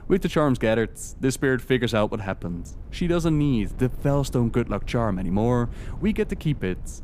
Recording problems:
wind noise on the microphone; occasional gusts; 25 dB below the speech

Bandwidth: 15 kHz